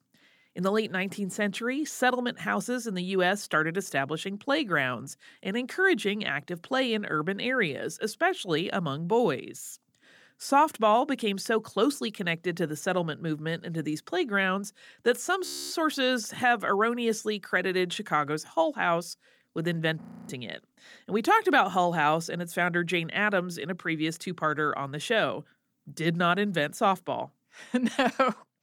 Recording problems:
audio freezing; at 15 s and at 20 s

